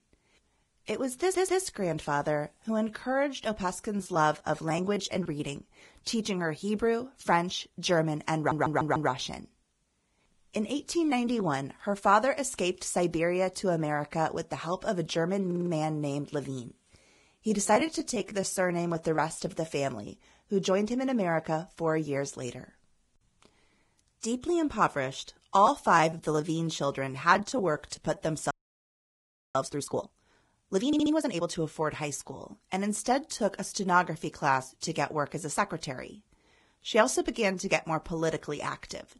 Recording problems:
garbled, watery; badly; nothing above 11.5 kHz
audio stuttering; 4 times, first at 1 s
choppy; very; from 4 to 5.5 s, from 17 to 19 s and from 26 to 30 s; 11% of the speech affected
audio freezing; at 29 s for 1 s

